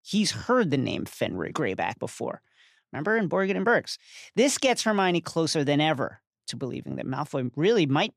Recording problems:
none

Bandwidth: 15 kHz